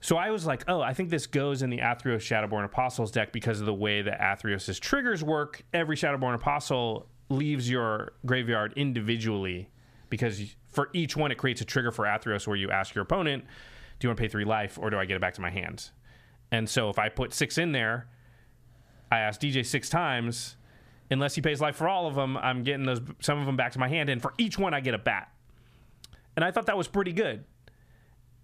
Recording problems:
squashed, flat; somewhat

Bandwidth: 14.5 kHz